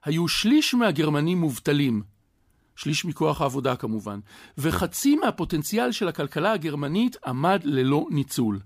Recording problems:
none

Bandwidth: 15 kHz